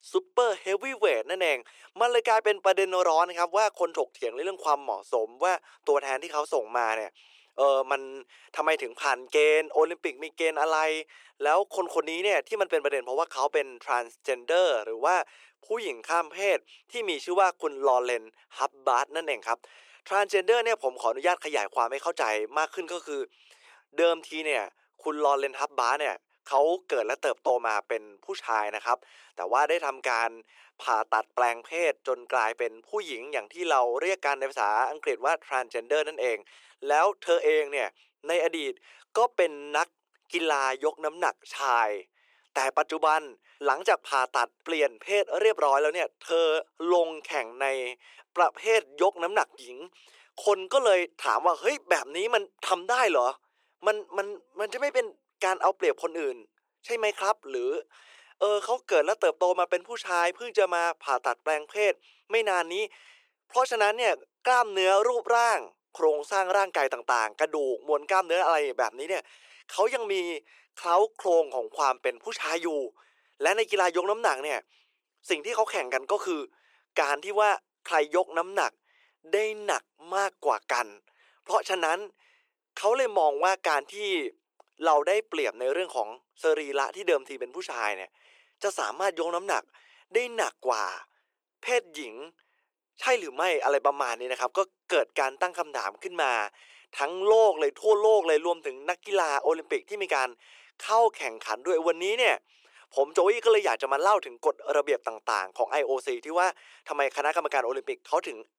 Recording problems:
thin; very; fading below 400 Hz

